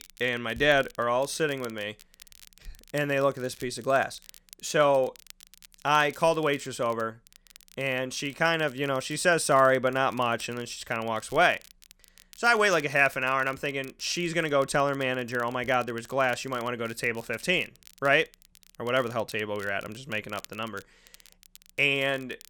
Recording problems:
crackle, like an old record; faint; 25 dB below the speech

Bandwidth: 17.5 kHz